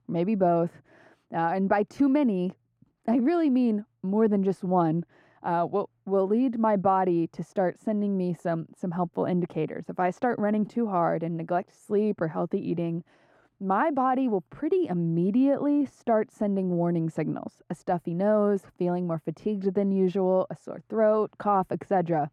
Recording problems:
muffled; very; fading above 2 kHz

